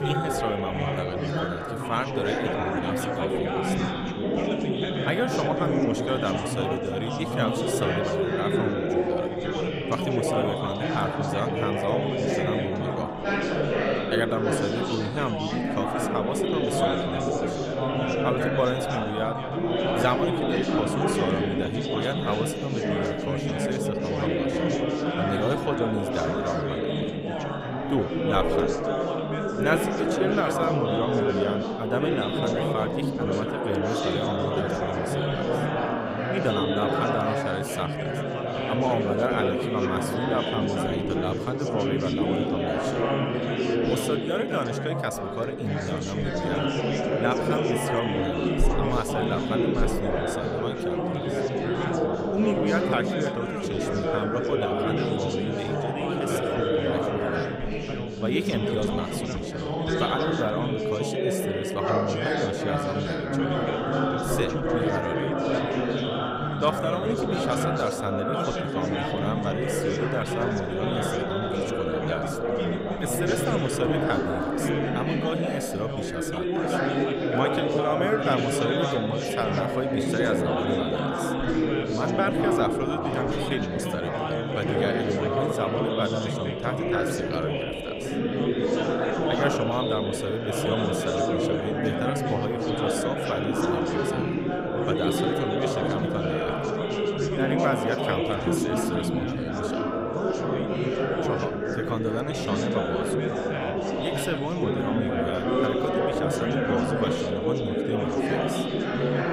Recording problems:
chatter from many people; very loud; throughout; 4 dB above the speech

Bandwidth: 15.5 kHz